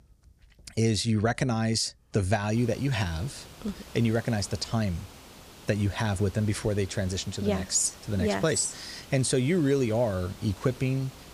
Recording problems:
hiss; noticeable; from 2.5 s on; 20 dB below the speech

